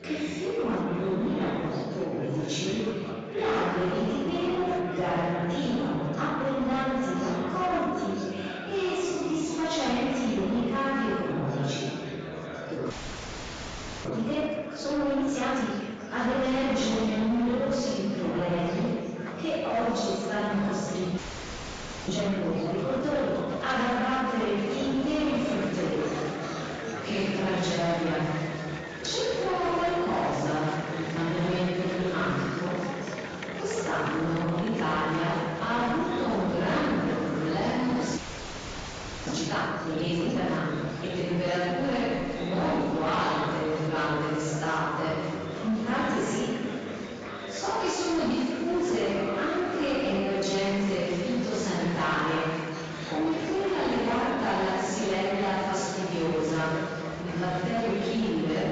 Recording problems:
room echo; strong; dies away in 2 s
off-mic speech; far
garbled, watery; badly; nothing above 7.5 kHz
distortion; slight; 13% of the sound clipped
murmuring crowd; loud; throughout; 9 dB below the speech
audio freezing; at 13 s for 1 s, at 21 s for 1 s and at 38 s for 1 s

